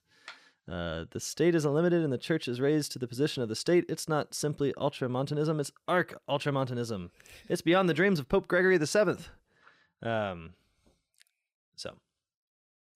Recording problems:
none

